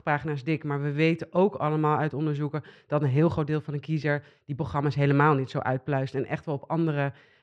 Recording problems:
muffled; very slightly; fading above 3 kHz

